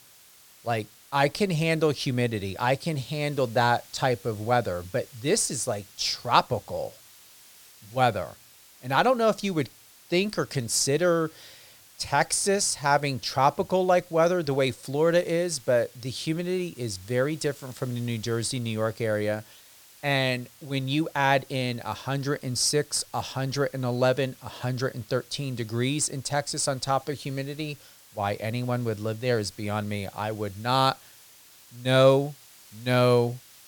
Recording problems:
hiss; faint; throughout; 25 dB below the speech

